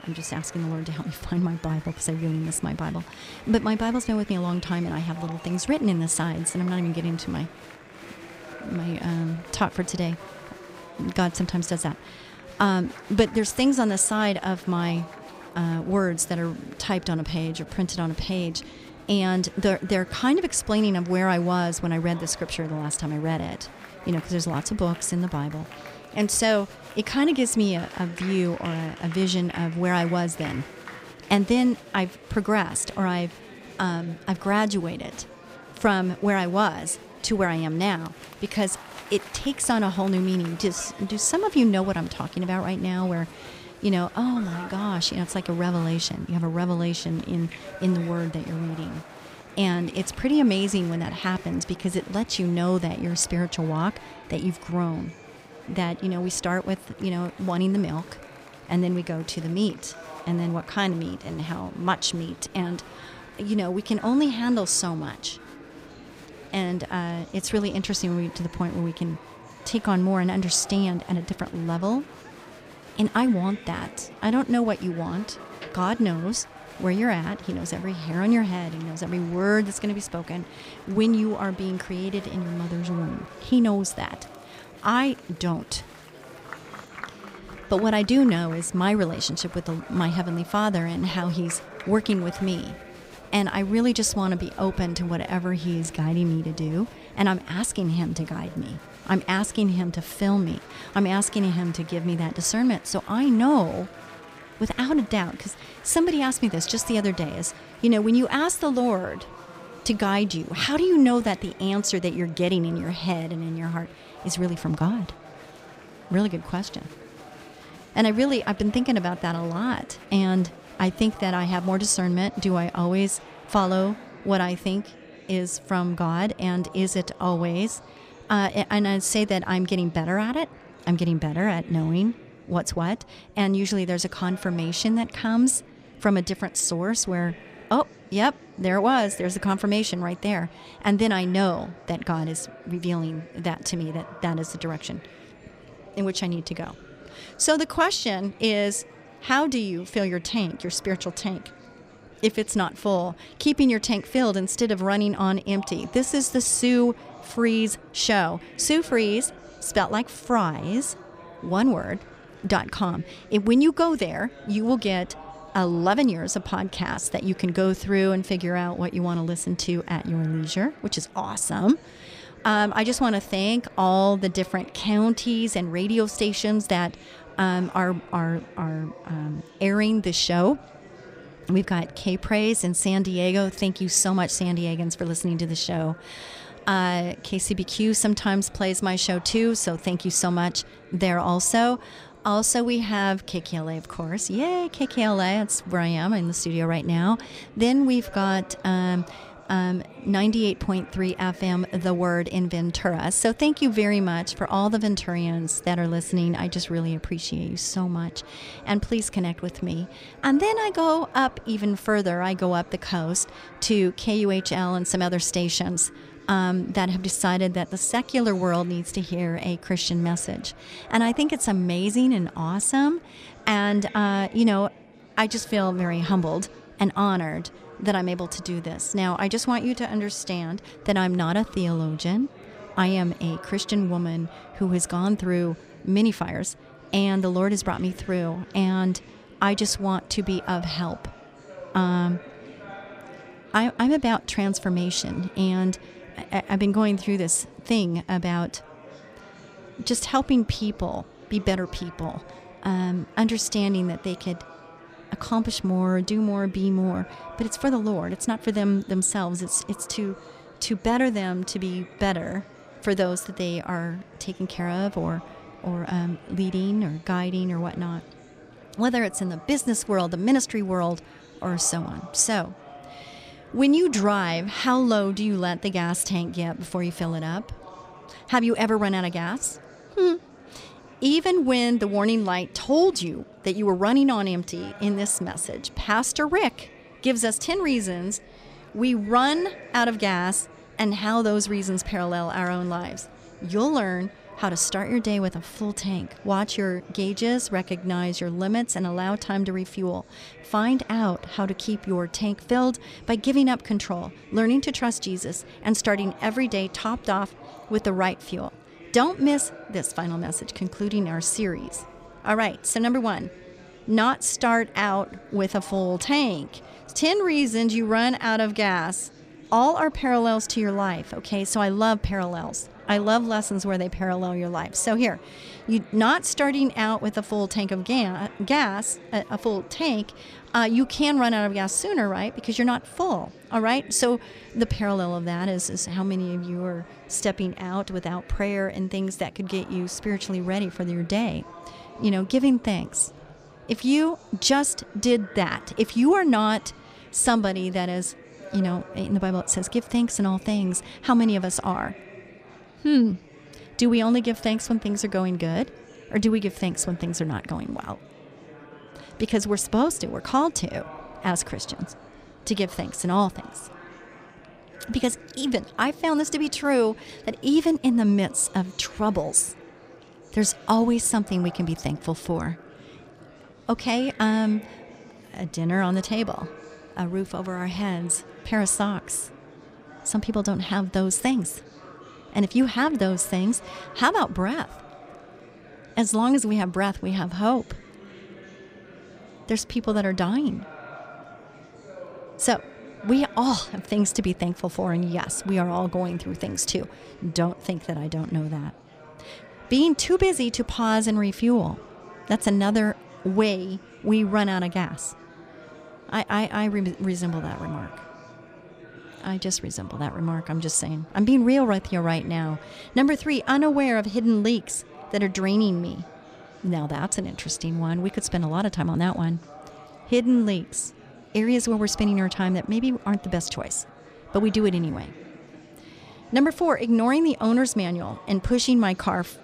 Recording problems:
murmuring crowd; noticeable; throughout; 20 dB below the speech

